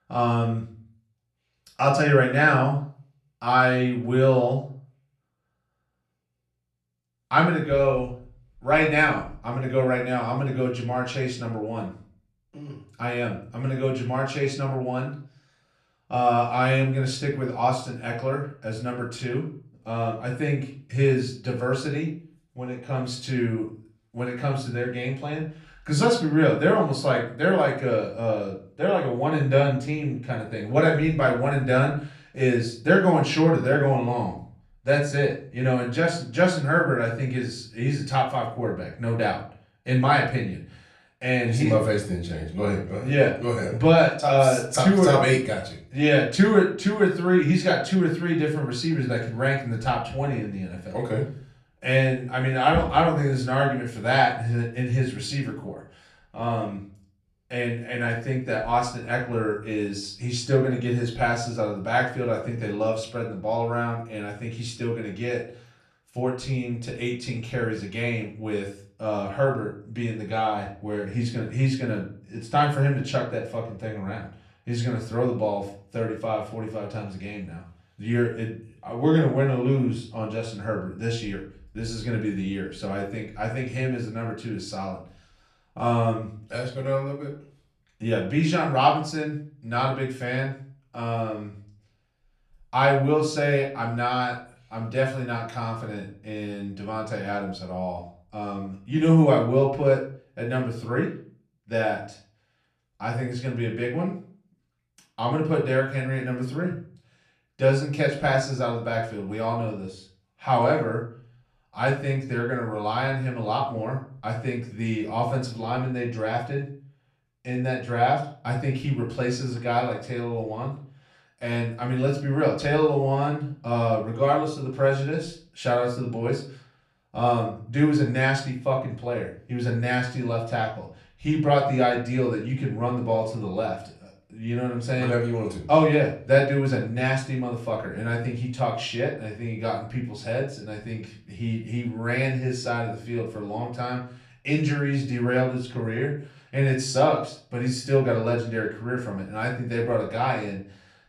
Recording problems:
off-mic speech; far
room echo; slight; dies away in 0.4 s

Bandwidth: 13.5 kHz